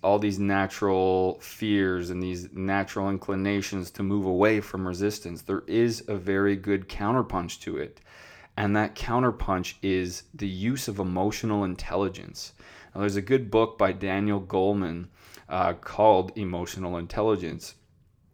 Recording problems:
none

